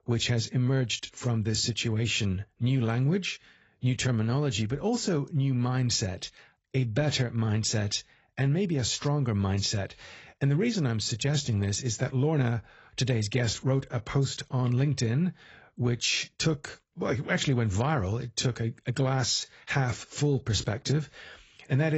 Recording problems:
garbled, watery; badly; nothing above 7.5 kHz
abrupt cut into speech; at the end

